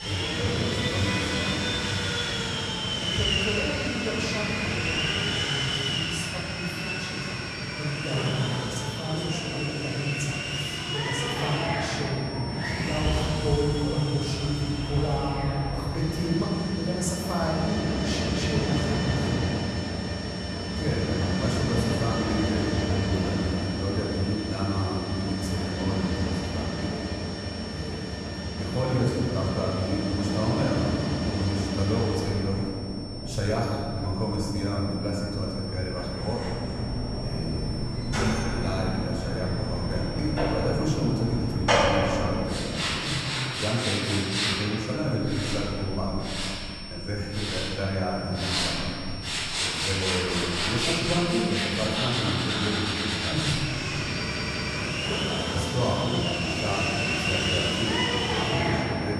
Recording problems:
off-mic speech; far
room echo; noticeable; dies away in 2.3 s
machinery noise; very loud; throughout; 1 dB above the speech
high-pitched whine; noticeable; throughout; 5.5 kHz, 10 dB below the speech
audio stuttering; at 54 s

